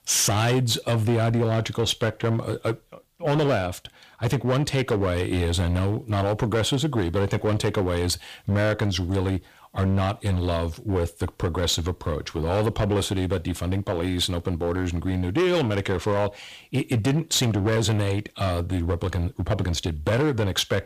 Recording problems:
distortion; slight; 11% of the sound clipped

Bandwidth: 15 kHz